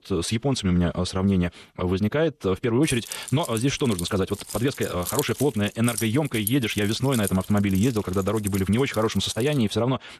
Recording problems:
wrong speed, natural pitch; too fast; 1.6 times normal speed
jangling keys; noticeable; from 3 to 9.5 s; peak 6 dB below the speech

